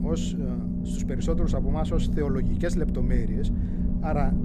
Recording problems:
low rumble; loud; throughout; 3 dB below the speech

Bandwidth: 15 kHz